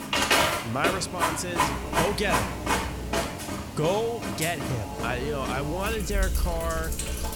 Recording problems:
household noises; very loud; throughout; 2 dB above the speech
electrical hum; noticeable; from 1.5 to 3.5 s and from 5 s on; 60 Hz, 15 dB below the speech

